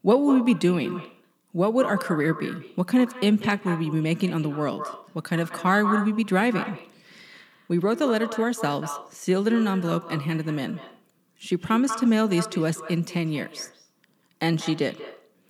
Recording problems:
echo of what is said; strong; throughout; 190 ms later, 10 dB below the speech

